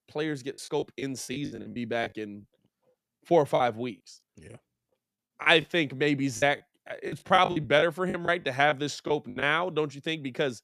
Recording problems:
choppy; very; 11% of the speech affected

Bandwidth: 14.5 kHz